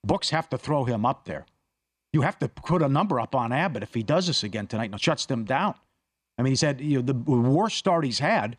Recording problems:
uneven, jittery; strongly; from 0.5 to 6.5 s

